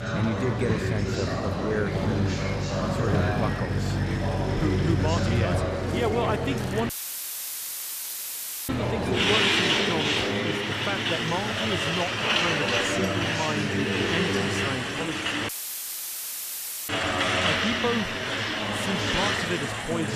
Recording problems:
traffic noise; very loud; throughout; 4 dB above the speech
chatter from many people; very loud; throughout; 1 dB above the speech
audio cutting out; filled with static; at 7 s for 2 s and at 15 s for 1.5 s
abrupt cut into speech; at the end

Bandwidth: 14.5 kHz